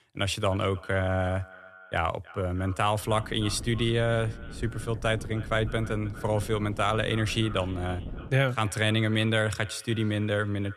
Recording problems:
echo of what is said; faint; throughout; 310 ms later, 20 dB below the speech
wind noise on the microphone; occasional gusts; from 3 to 8.5 s; 20 dB below the speech

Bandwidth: 13.5 kHz